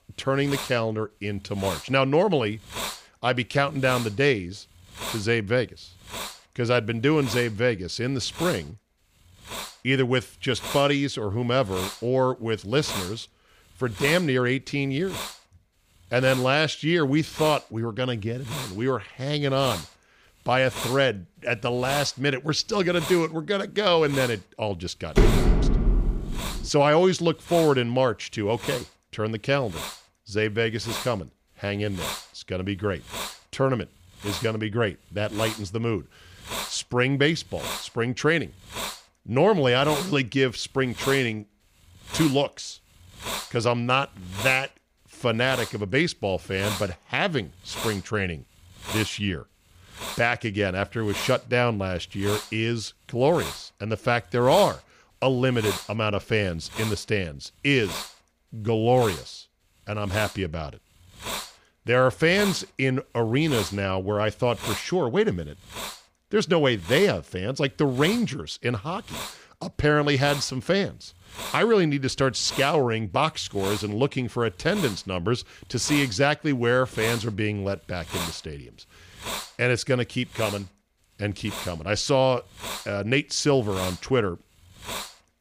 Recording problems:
hiss; noticeable; throughout; 10 dB below the speech
door banging; loud; from 25 to 27 s; peak 4 dB above the speech

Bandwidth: 15 kHz